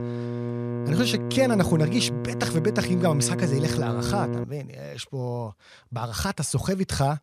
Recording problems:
electrical hum; loud; until 4.5 s; 60 Hz, 6 dB below the speech

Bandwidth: 14.5 kHz